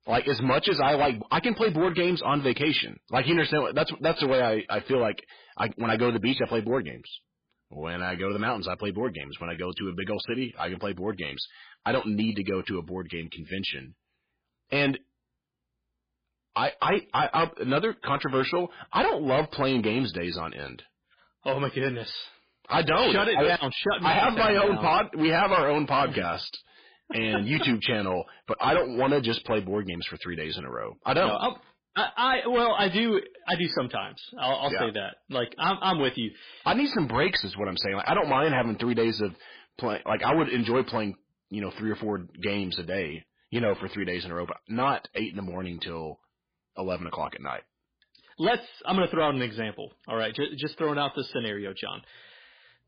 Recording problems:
distortion; heavy; 7% of the sound clipped
garbled, watery; badly

